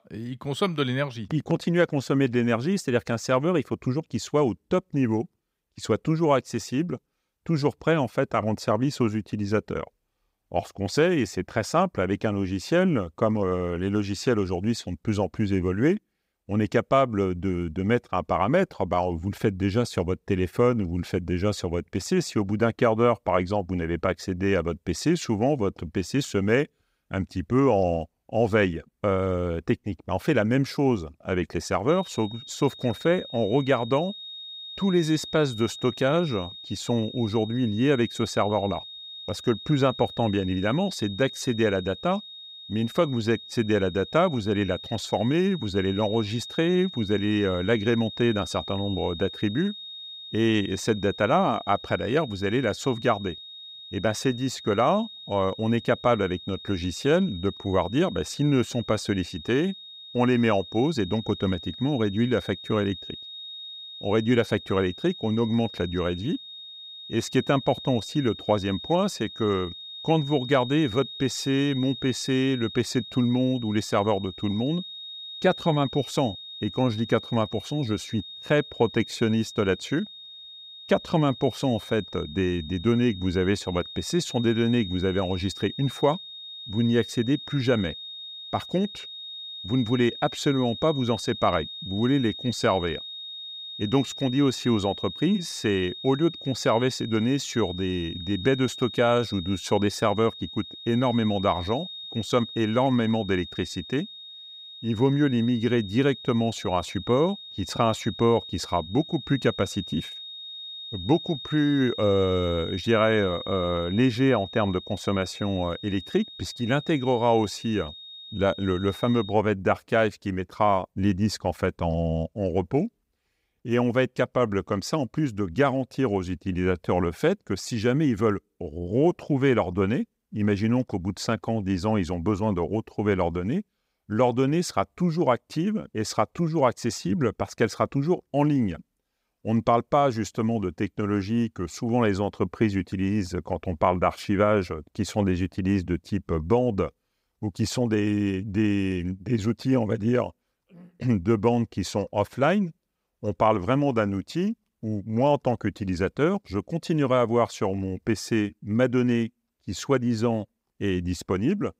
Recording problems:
high-pitched whine; noticeable; from 32 s to 1:59; 3.5 kHz, 10 dB below the speech

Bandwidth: 15.5 kHz